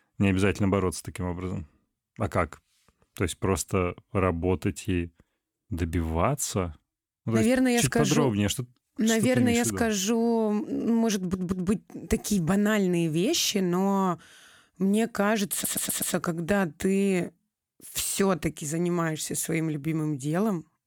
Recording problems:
audio stuttering; at 11 s and at 16 s

